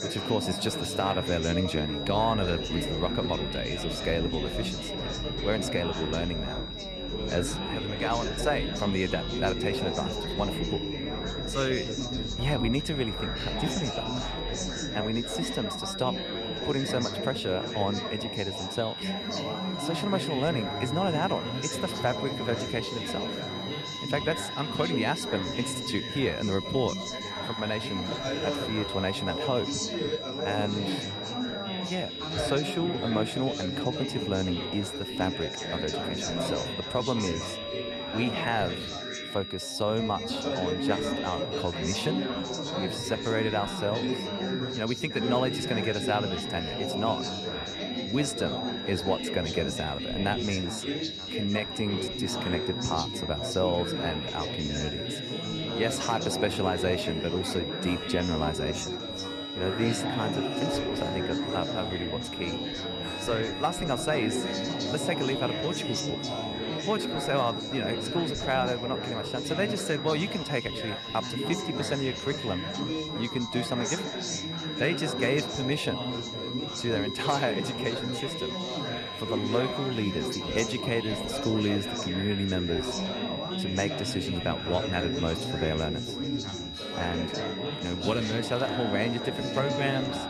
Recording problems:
high-pitched whine; loud; throughout; 4 kHz, 5 dB below the speech
chatter from many people; loud; throughout; 3 dB below the speech
background music; noticeable; throughout; 10 dB below the speech

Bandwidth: 14.5 kHz